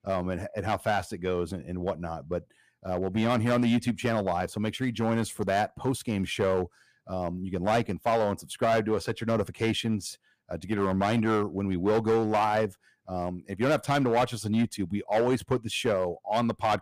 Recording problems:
distortion; slight; 6% of the sound clipped

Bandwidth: 15 kHz